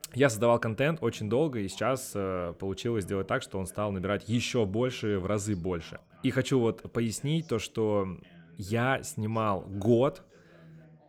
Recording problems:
background chatter; faint; throughout; 2 voices, 25 dB below the speech

